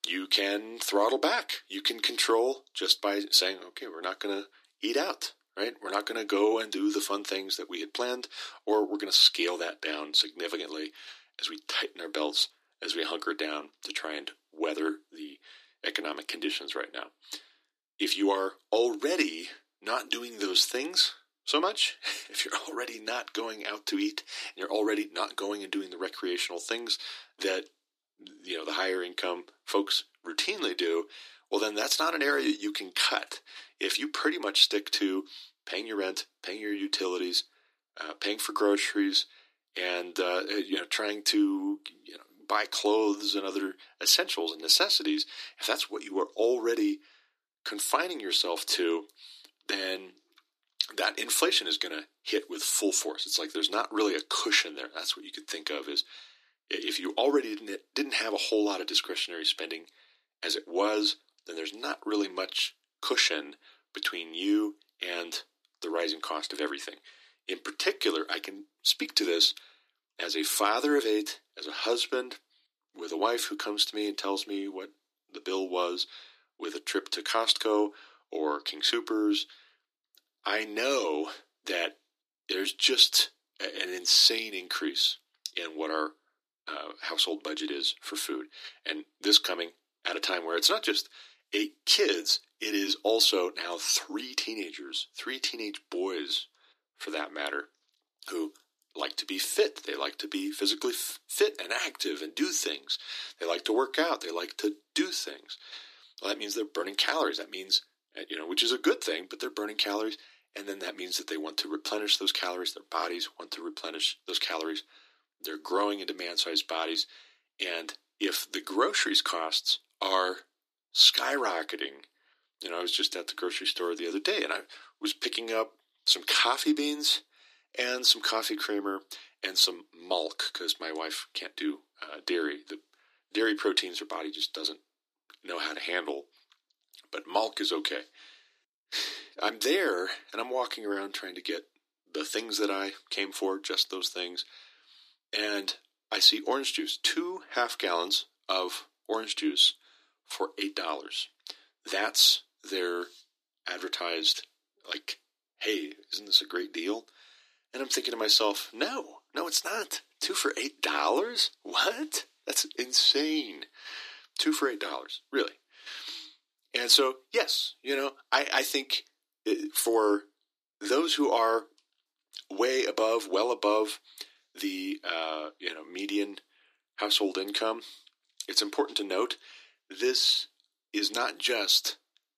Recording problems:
thin; very; fading below 300 Hz

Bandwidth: 14.5 kHz